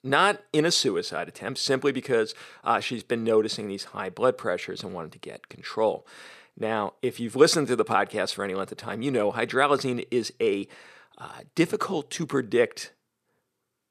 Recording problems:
none

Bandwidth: 14.5 kHz